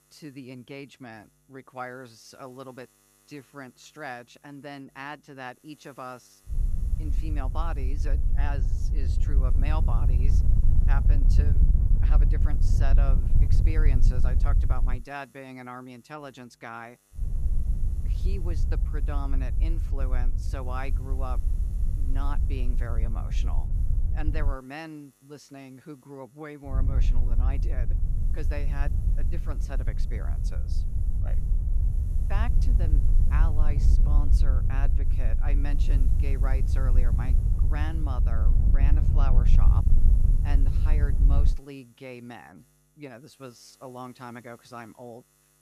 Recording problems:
wind noise on the microphone; heavy; from 6.5 to 15 s, from 17 to 25 s and from 27 to 42 s; 4 dB below the speech
electrical hum; faint; throughout; 50 Hz, 25 dB below the speech

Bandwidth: 14.5 kHz